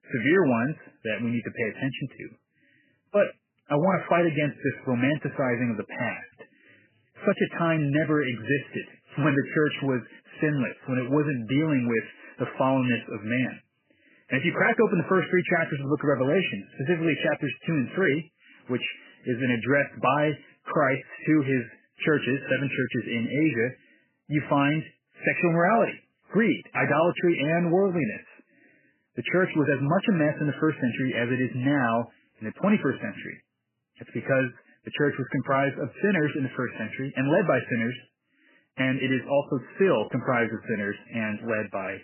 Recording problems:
garbled, watery; badly; nothing above 3 kHz

